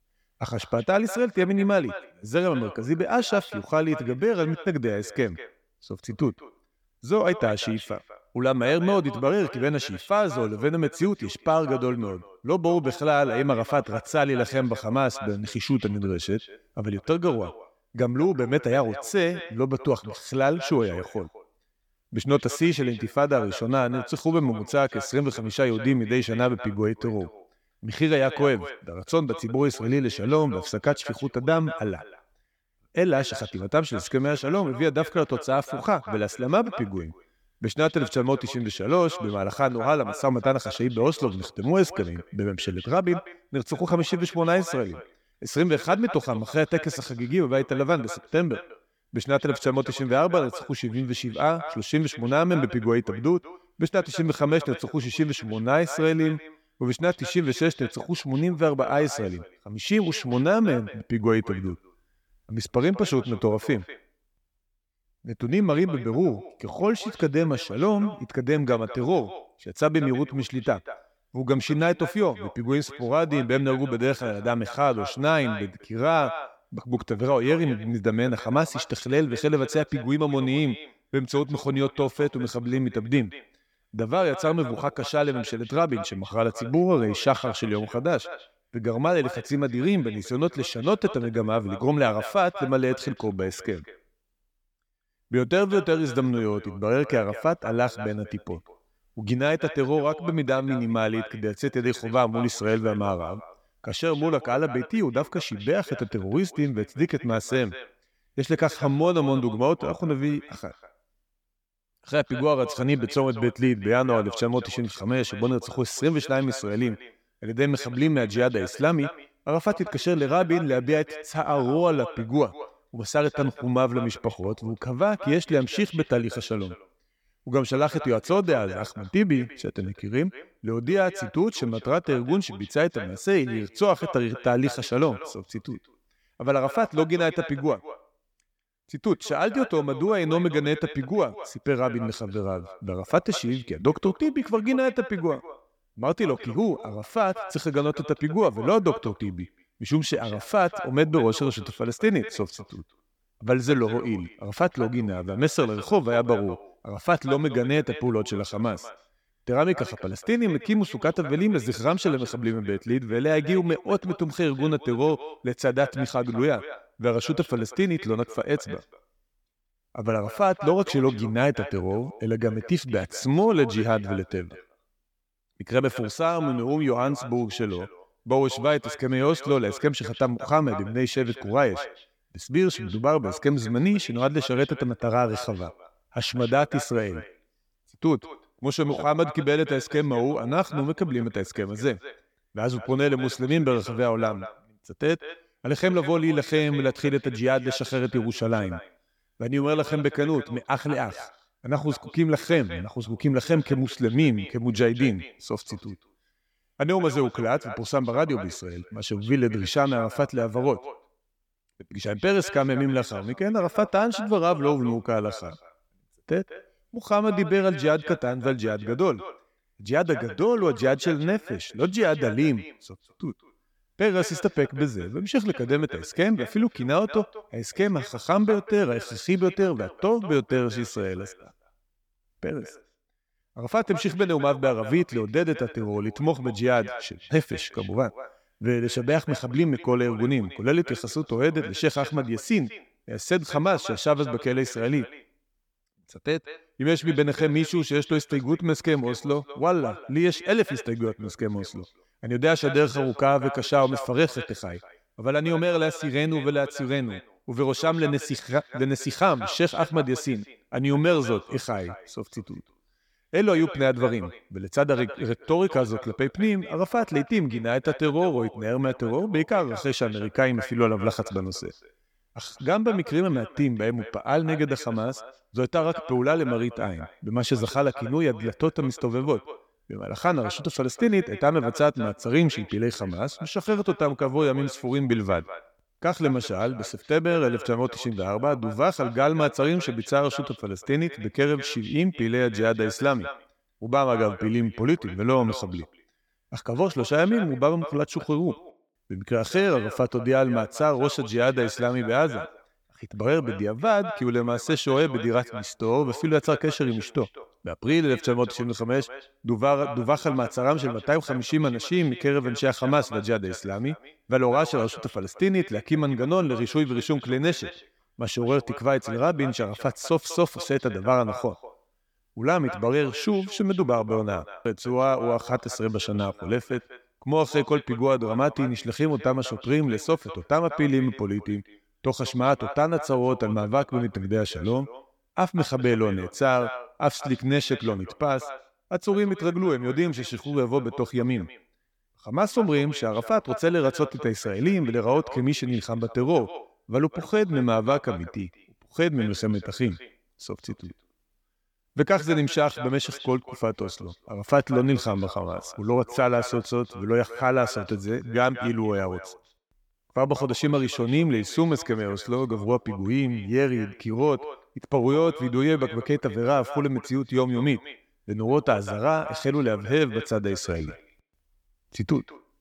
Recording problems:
echo of what is said; noticeable; throughout; 190 ms later, 15 dB below the speech

